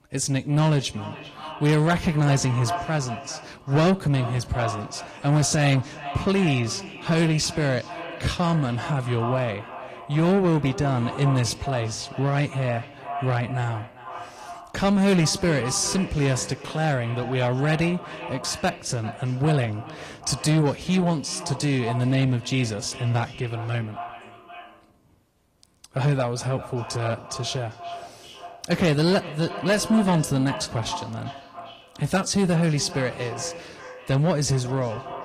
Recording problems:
echo of what is said; noticeable; throughout; 390 ms later, 15 dB below the speech
distortion; slight; 10 dB below the speech
garbled, watery; slightly

